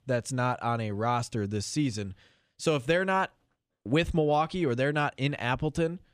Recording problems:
none

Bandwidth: 15 kHz